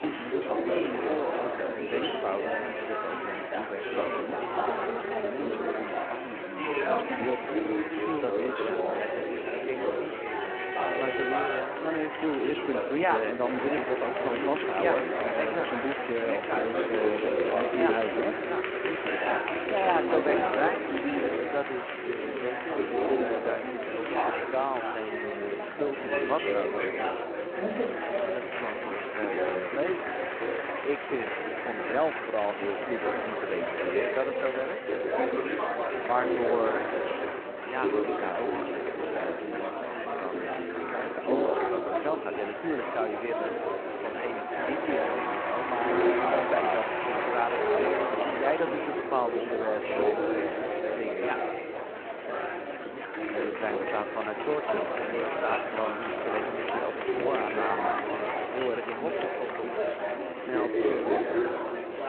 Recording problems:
echo of what is said; noticeable; throughout; 460 ms later, 15 dB below the speech
phone-call audio
chatter from many people; very loud; throughout; 3 dB above the speech
uneven, jittery; strongly; from 5 s to 1:01

